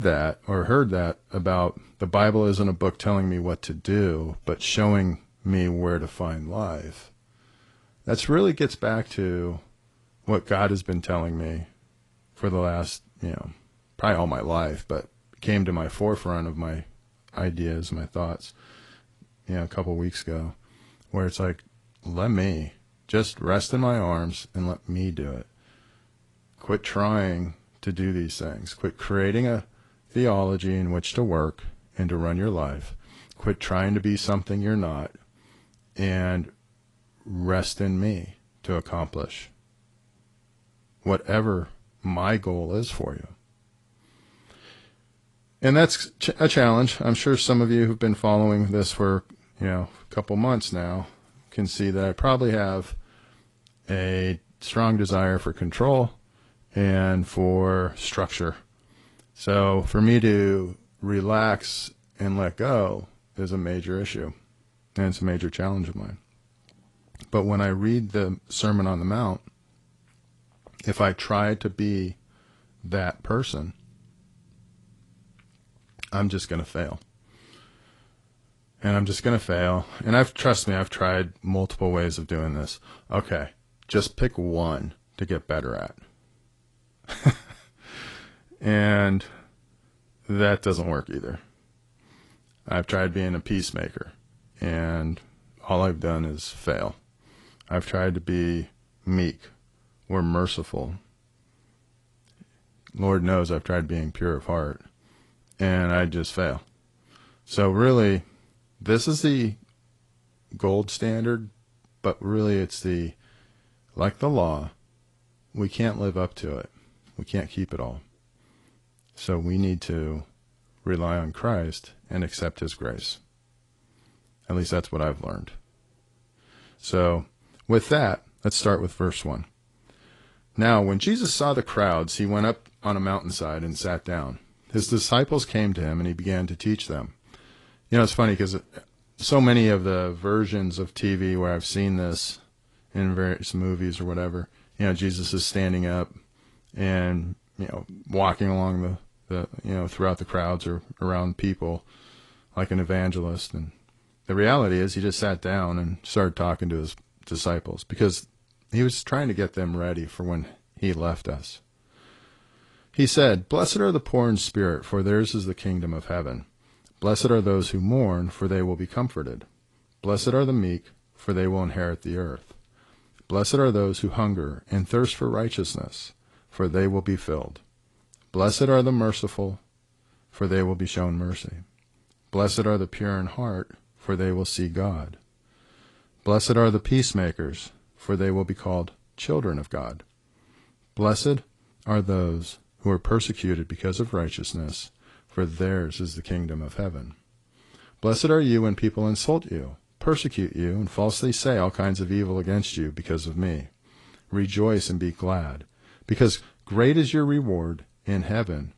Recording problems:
garbled, watery; slightly; nothing above 10.5 kHz
abrupt cut into speech; at the start

